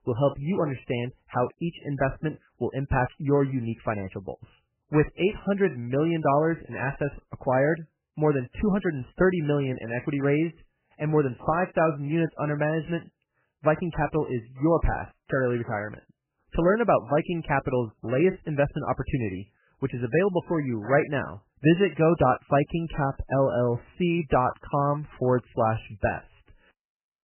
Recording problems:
garbled, watery; badly; nothing above 3 kHz

